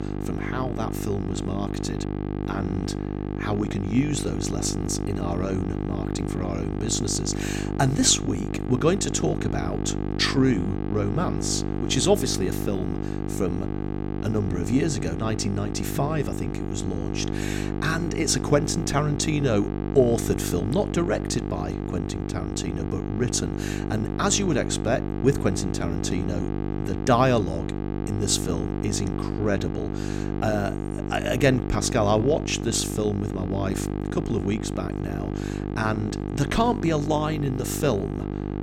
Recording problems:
electrical hum; loud; throughout; 50 Hz, 7 dB below the speech

